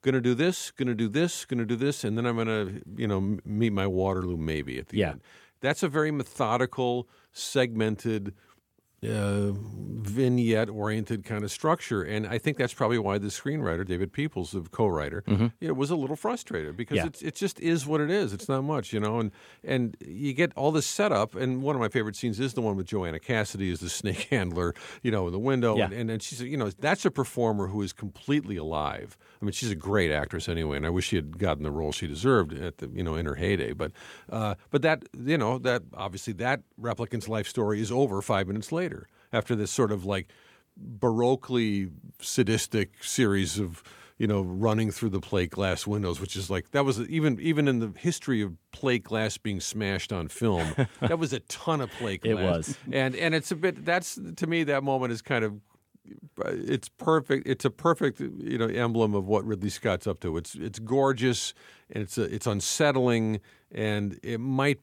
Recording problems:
none

